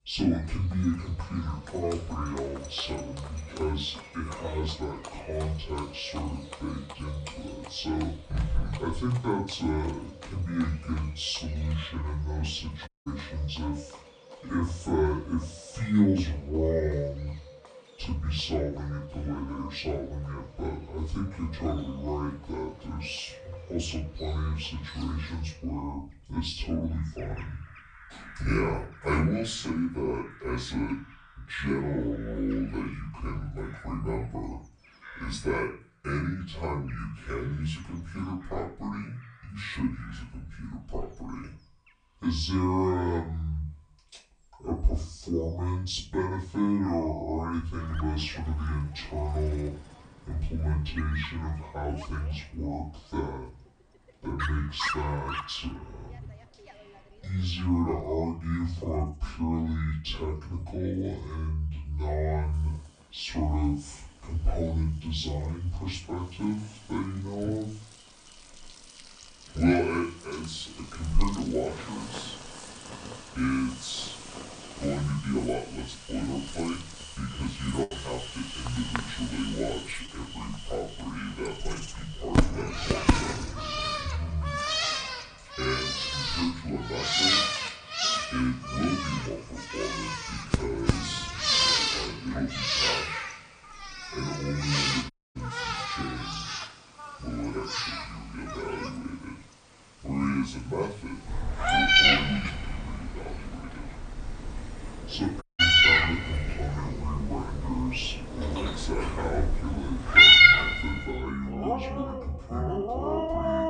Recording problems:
off-mic speech; far
wrong speed and pitch; too slow and too low; 0.6 times normal speed
room echo; slight; dies away in 0.3 s
animal sounds; very loud; throughout; 7 dB above the speech
audio cutting out; at 13 s, at 1:35 and at 1:45
choppy; occasionally; at 1:18; 2% of the speech affected

